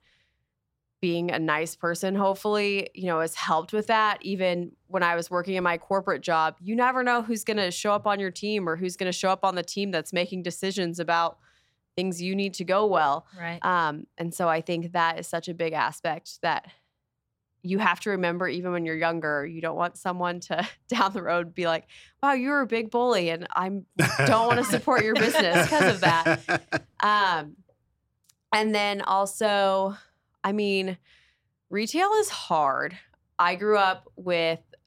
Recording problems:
none

